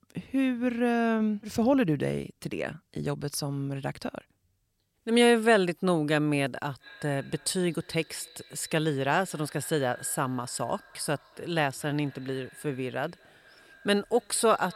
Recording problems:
echo of what is said; faint; from 7 s on; 240 ms later, 25 dB below the speech

